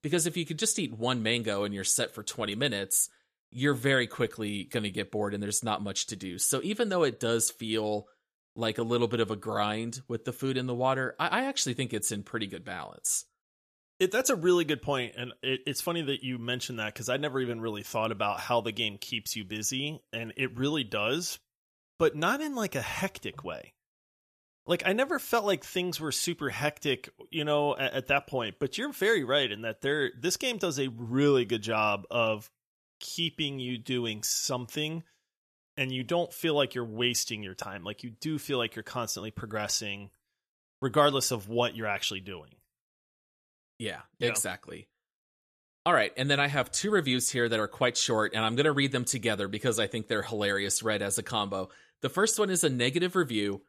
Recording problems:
none

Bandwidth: 14.5 kHz